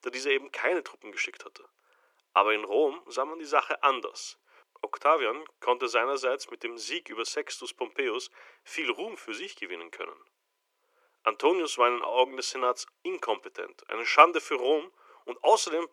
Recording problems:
thin; very; fading below 350 Hz

